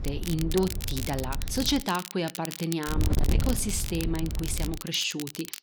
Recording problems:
distortion; slight; 10 dB below the speech
crackle, like an old record; loud; 9 dB below the speech
wind noise on the microphone; occasional gusts; until 2 s and from 3 to 5 s; 15 dB below the speech

